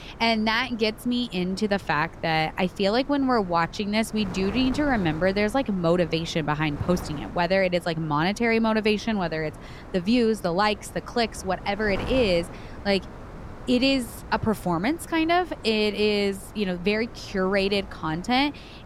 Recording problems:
wind noise on the microphone; occasional gusts; 20 dB below the speech

